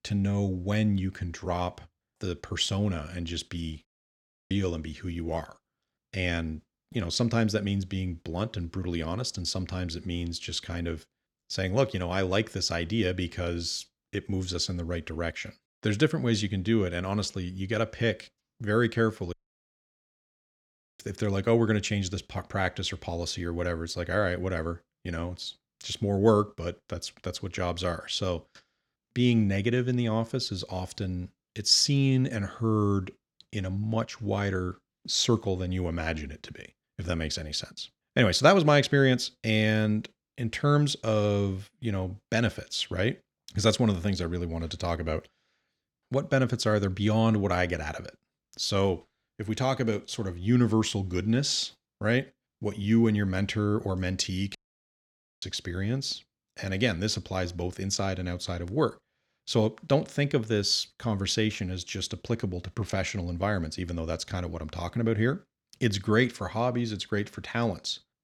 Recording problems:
audio cutting out; at 4 s for 0.5 s, at 19 s for 1.5 s and at 55 s for 1 s

